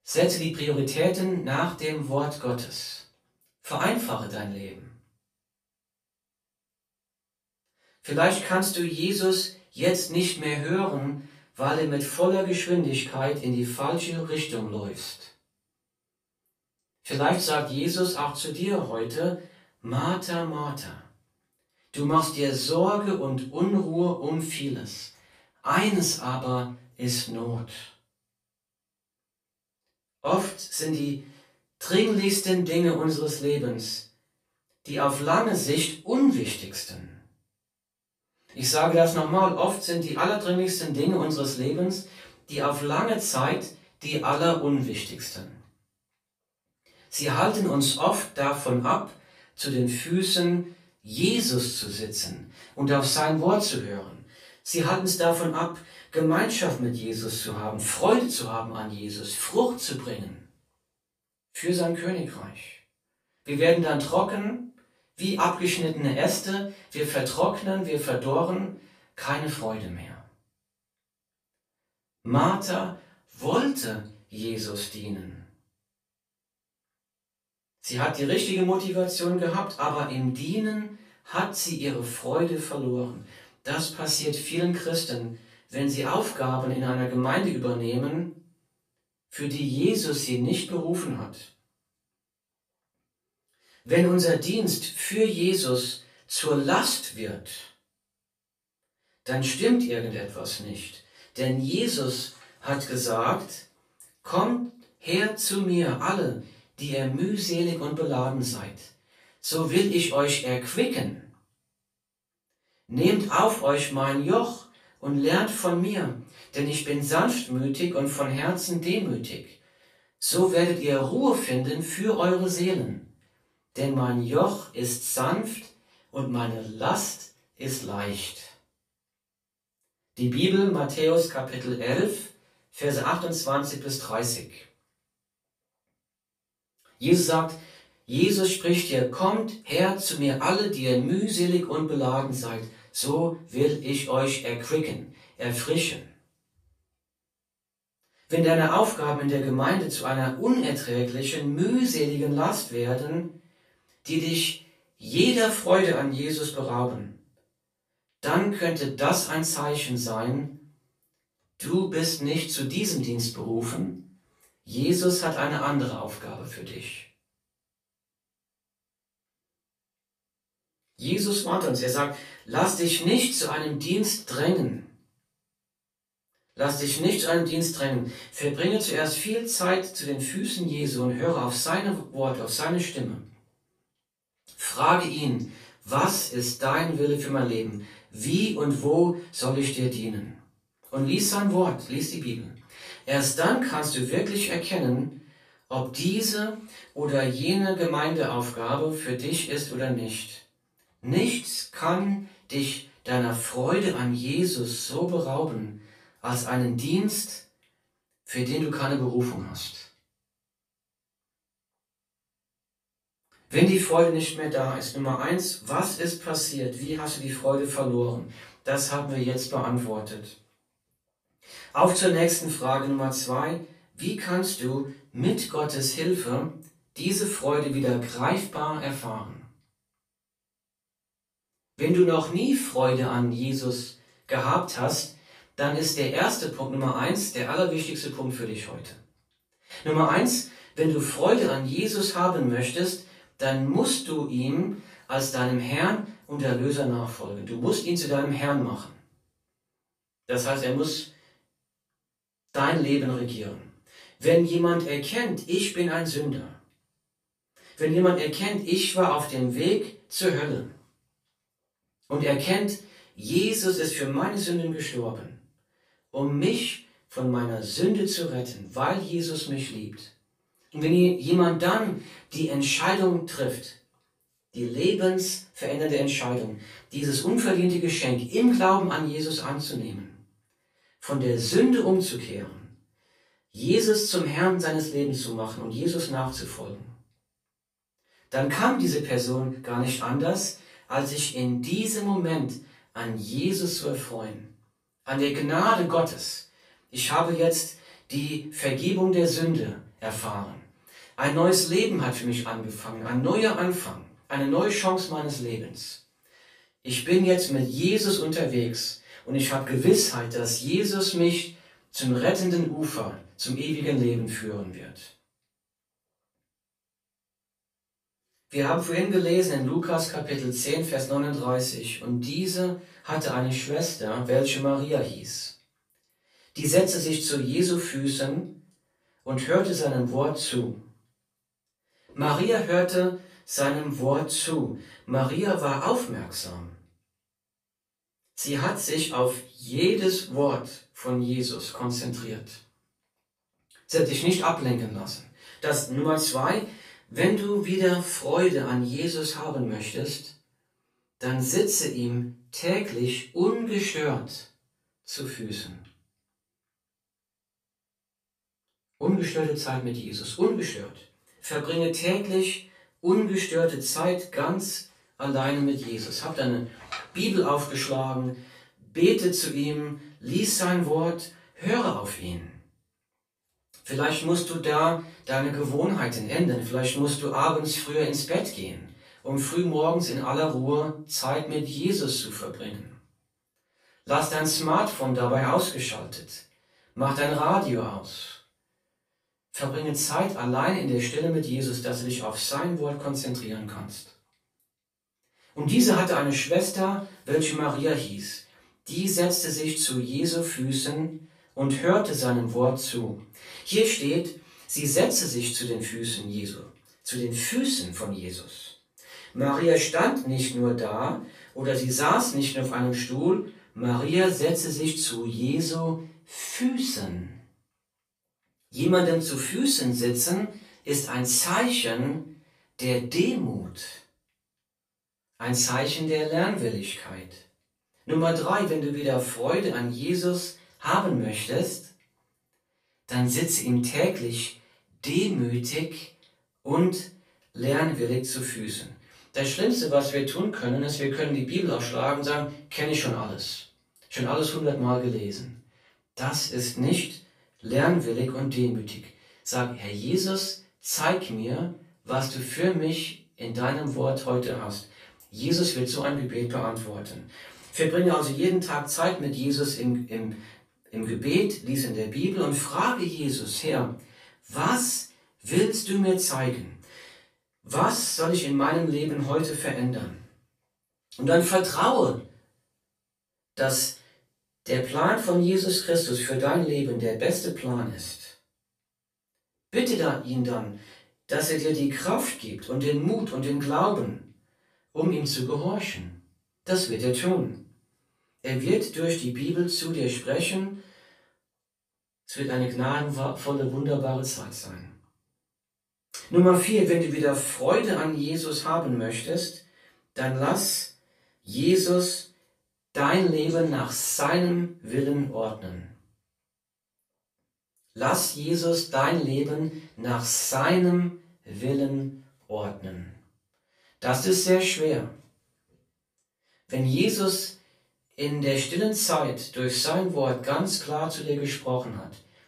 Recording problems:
off-mic speech; far
room echo; slight; dies away in 0.3 s

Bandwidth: 14.5 kHz